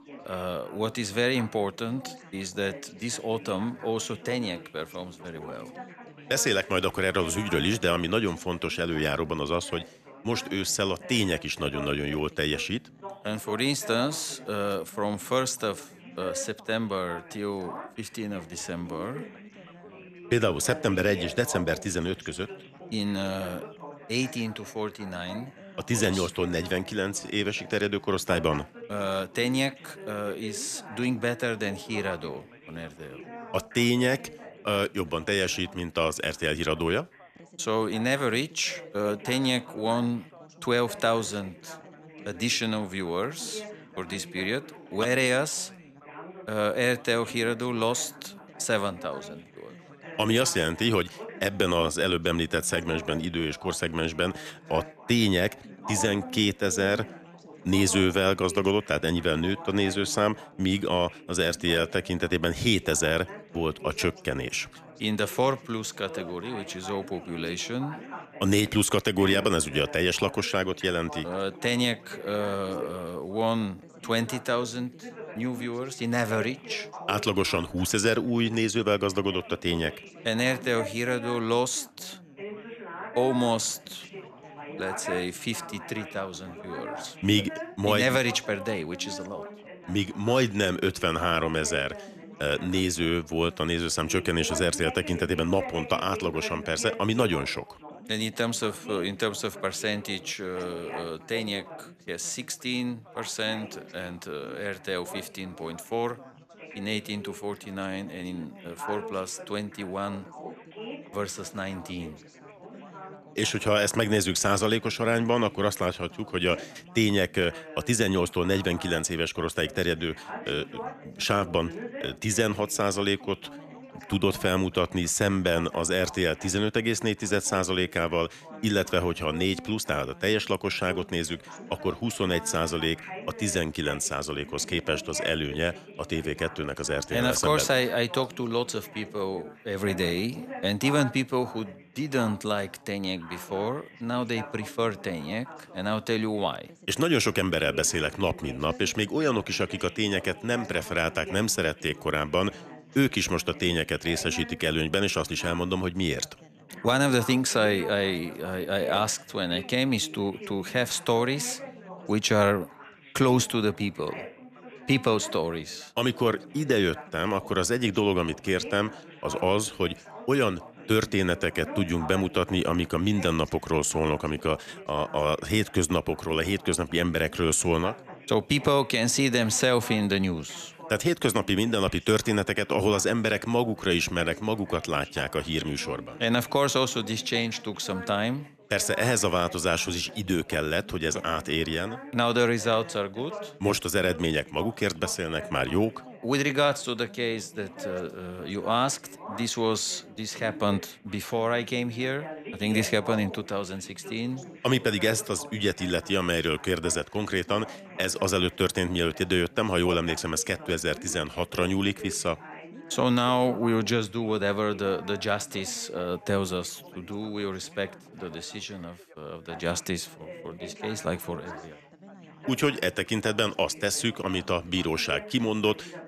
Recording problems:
background chatter; noticeable; throughout; 4 voices, 15 dB below the speech

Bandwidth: 14.5 kHz